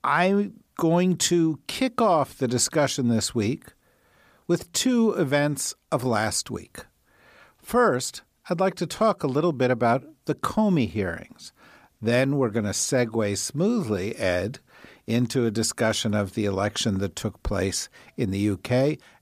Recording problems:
none

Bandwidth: 15 kHz